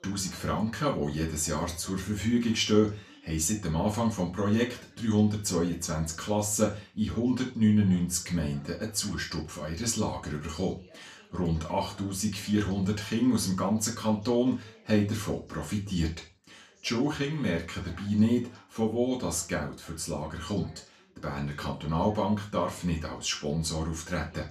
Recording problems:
off-mic speech; far
room echo; slight; dies away in 0.3 s
voice in the background; faint; throughout; 30 dB below the speech

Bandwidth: 14.5 kHz